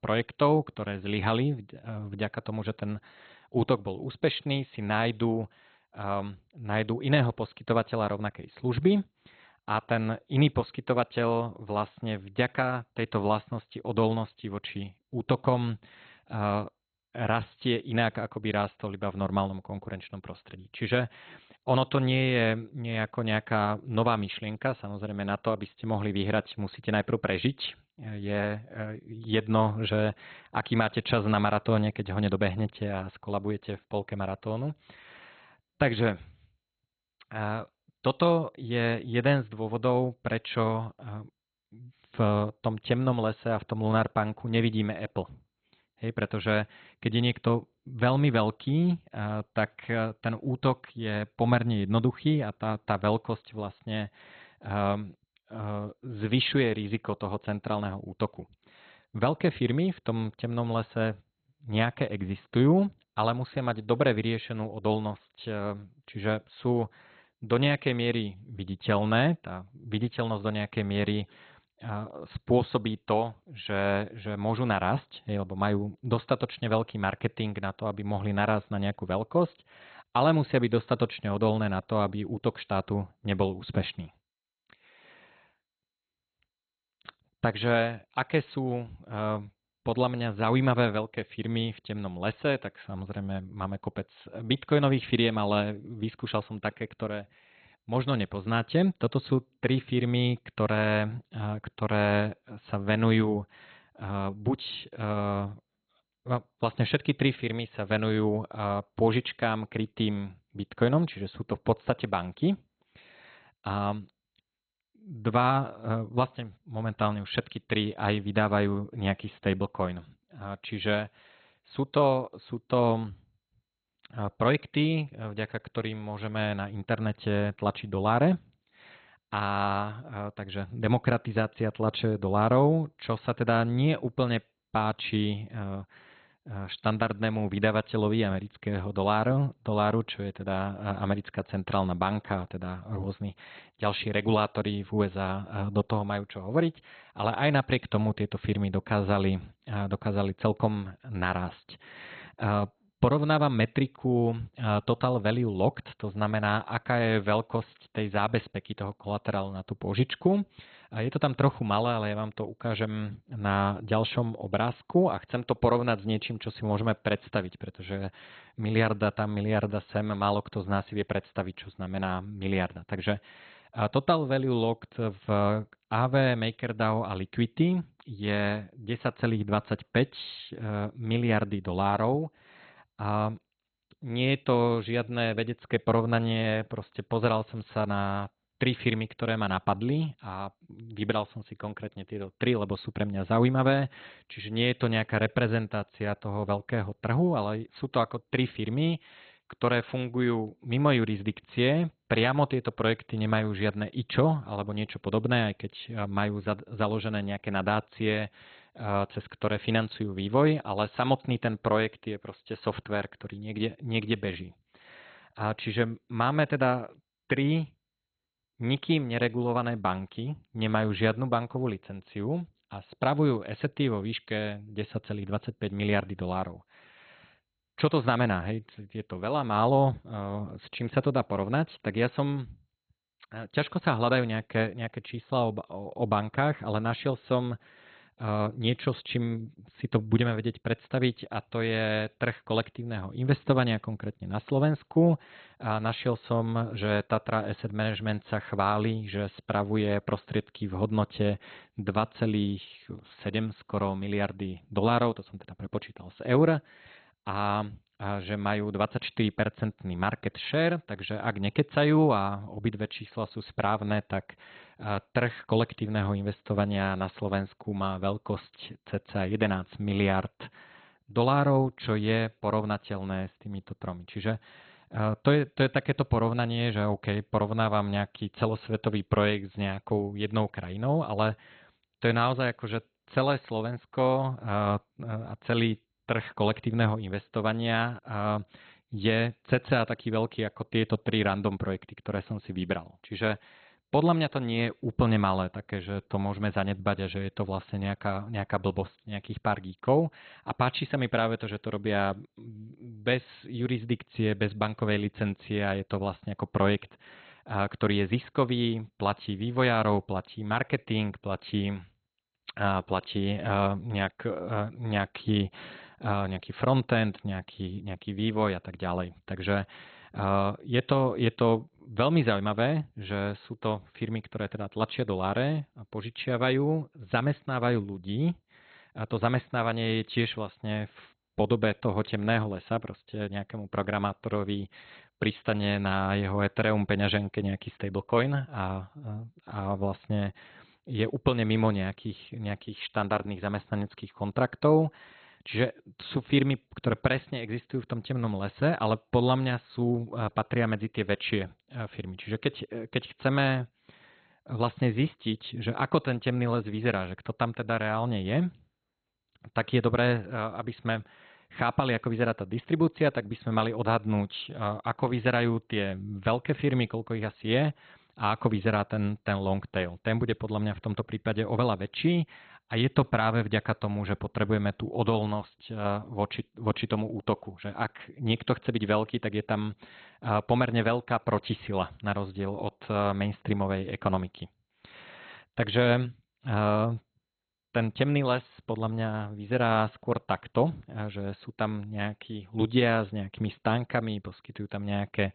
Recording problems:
garbled, watery; badly; nothing above 4 kHz

